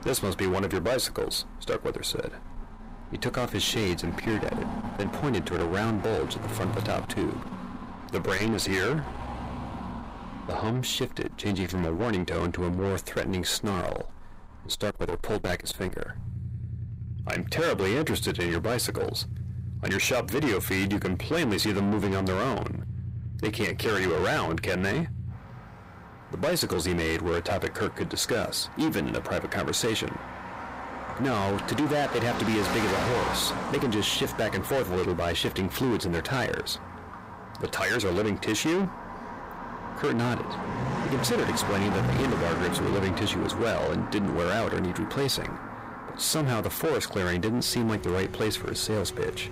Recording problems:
distortion; heavy; 6 dB below the speech
traffic noise; loud; throughout; 8 dB below the speech

